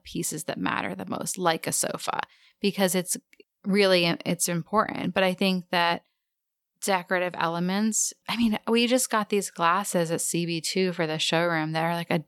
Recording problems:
none

